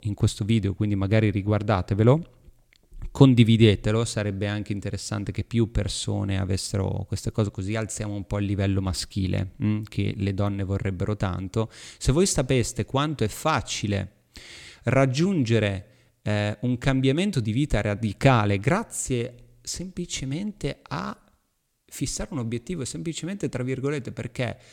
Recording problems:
none

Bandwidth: 17 kHz